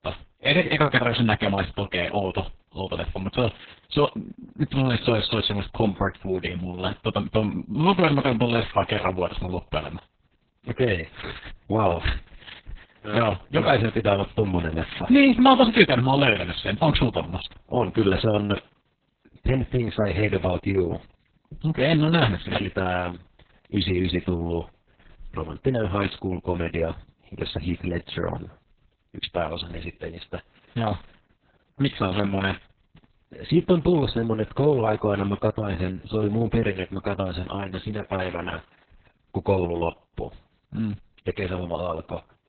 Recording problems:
garbled, watery; badly; nothing above 4 kHz

